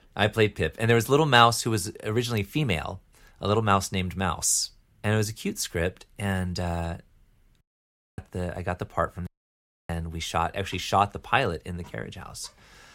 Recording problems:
audio cutting out; at 7.5 s for 0.5 s and at 9.5 s for 0.5 s

